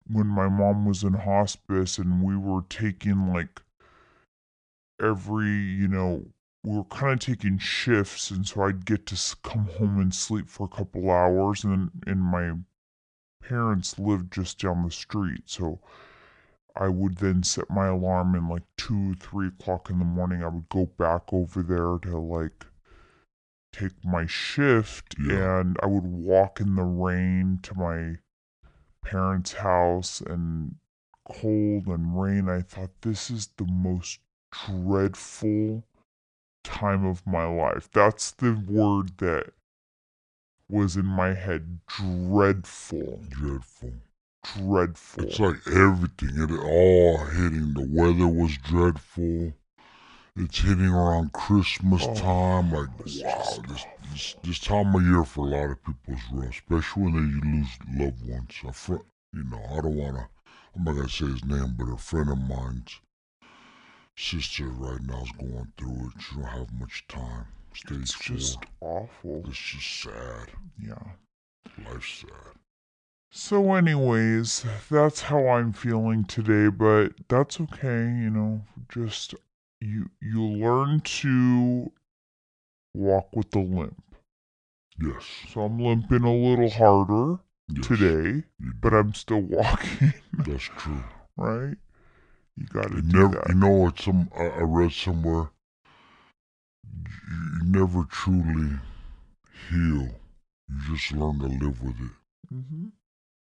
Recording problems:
wrong speed and pitch; too slow and too low; 0.7 times normal speed

